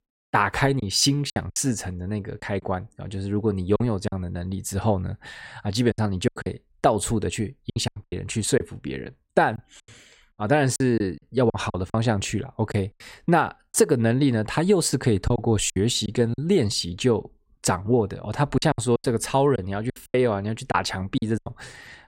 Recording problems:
choppy; very; 9% of the speech affected

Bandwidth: 16 kHz